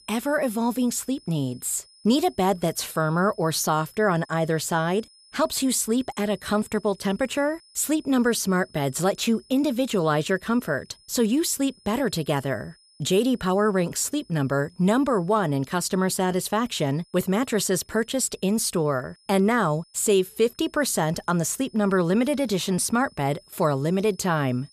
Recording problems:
high-pitched whine; faint; throughout; 5 kHz, 30 dB below the speech

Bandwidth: 14.5 kHz